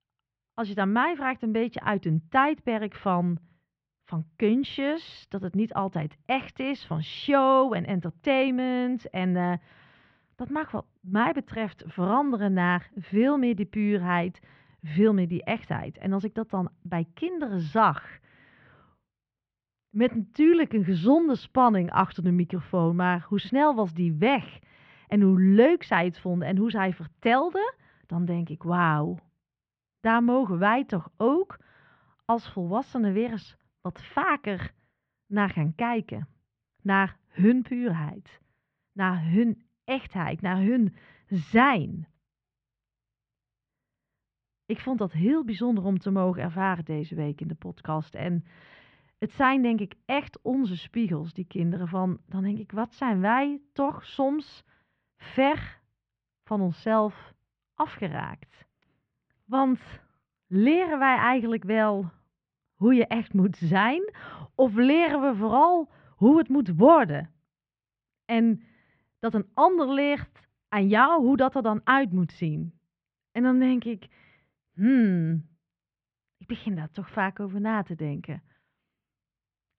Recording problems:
muffled; very; fading above 3 kHz

